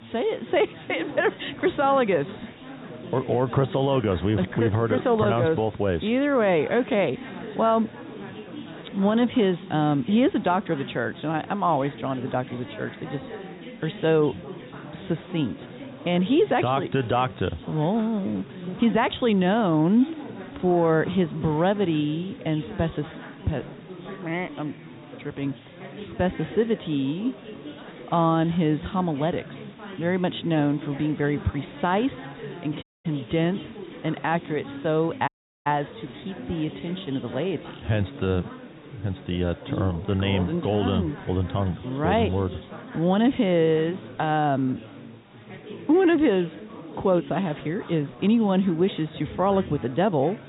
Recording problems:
high frequencies cut off; severe; nothing above 4 kHz
chatter from many people; noticeable; throughout; 15 dB below the speech
hiss; faint; throughout; 25 dB below the speech
audio cutting out; at 33 s and at 35 s

